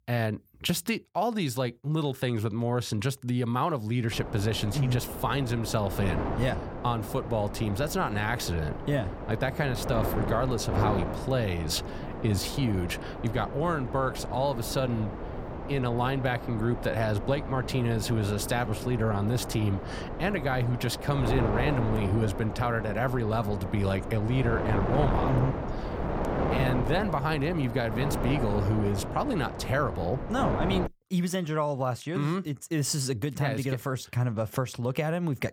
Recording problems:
wind noise on the microphone; heavy; from 4 to 31 s; 5 dB below the speech

